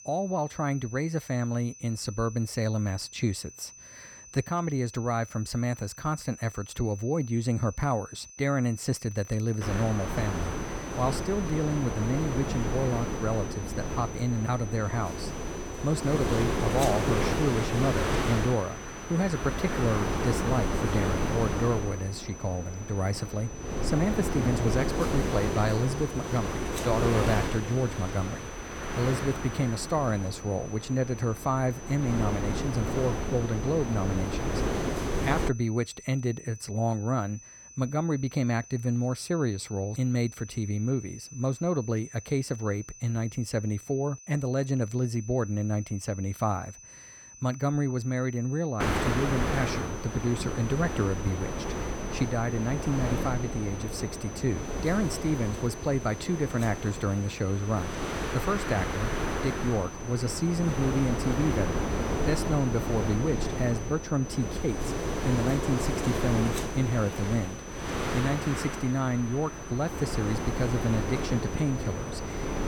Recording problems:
wind noise on the microphone; heavy; from 9.5 to 35 s and from 49 s on; 1 dB below the speech
high-pitched whine; noticeable; throughout; 6 kHz, 15 dB below the speech

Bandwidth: 17.5 kHz